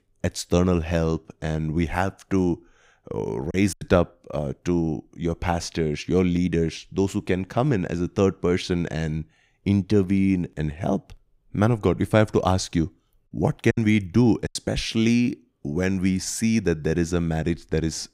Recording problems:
choppy; very; at 3.5 s and at 14 s; 10% of the speech affected

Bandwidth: 15.5 kHz